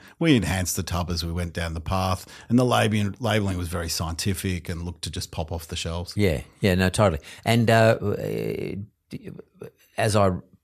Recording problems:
none

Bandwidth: 14 kHz